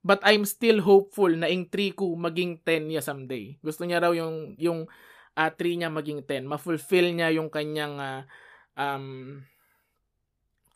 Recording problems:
none

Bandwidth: 14.5 kHz